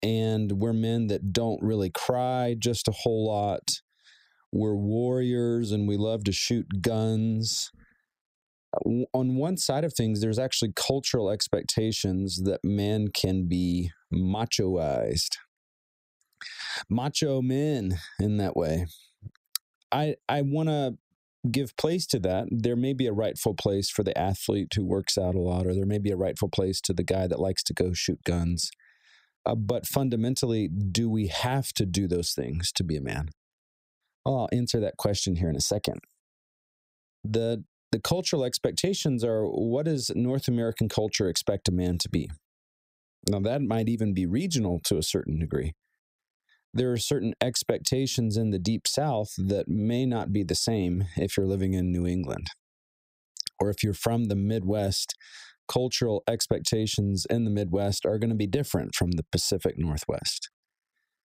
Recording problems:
squashed, flat; heavily

